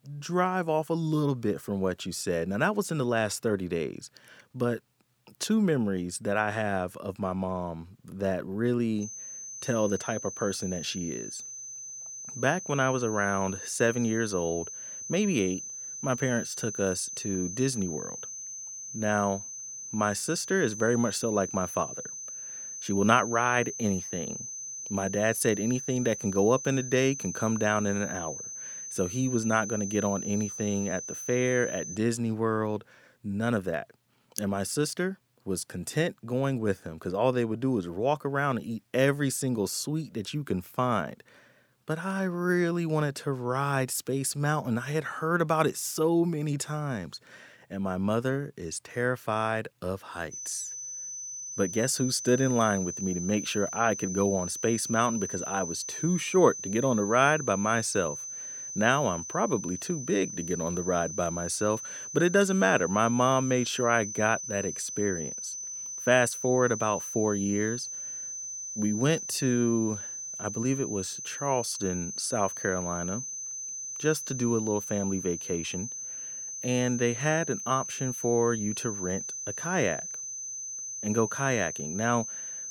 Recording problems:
high-pitched whine; loud; from 9 to 32 s and from 50 s on; 6 kHz, 7 dB below the speech

